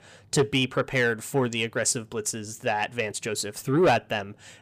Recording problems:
distortion; slight; 10 dB below the speech

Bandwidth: 15 kHz